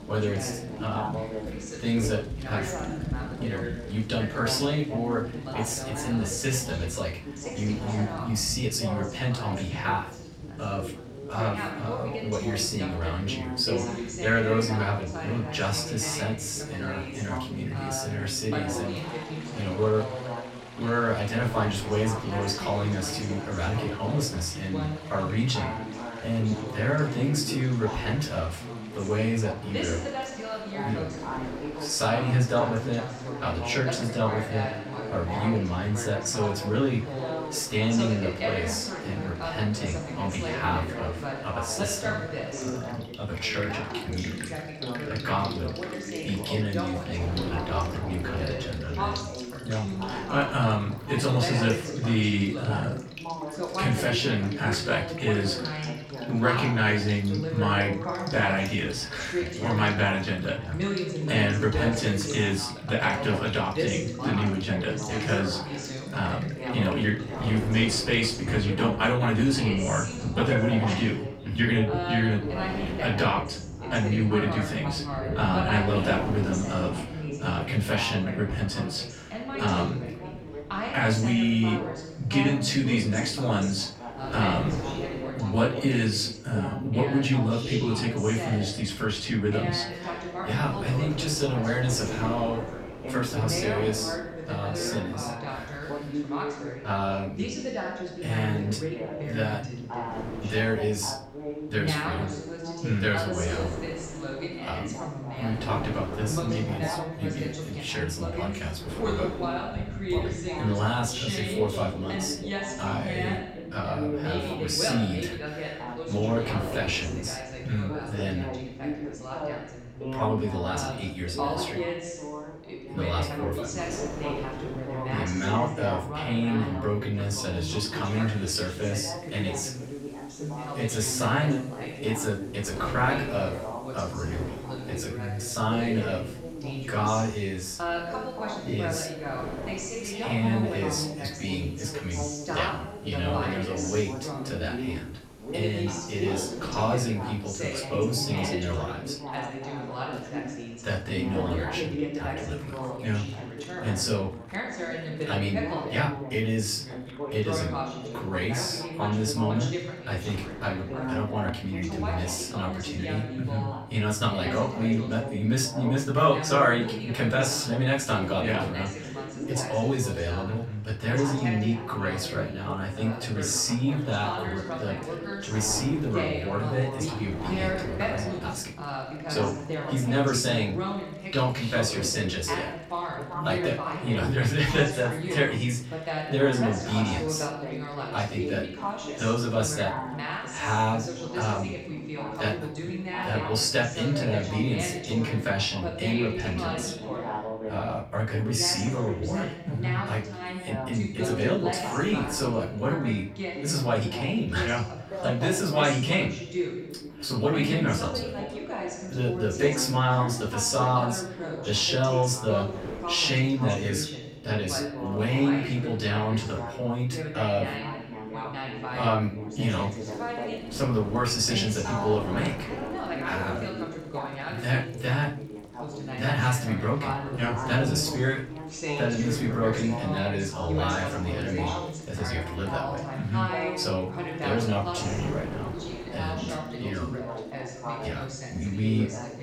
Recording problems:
off-mic speech; far
room echo; slight; dies away in 0.4 s
background chatter; loud; throughout; 2 voices, 6 dB below the speech
rain or running water; noticeable; throughout; 15 dB below the speech
wind noise on the microphone; occasional gusts; 20 dB below the speech

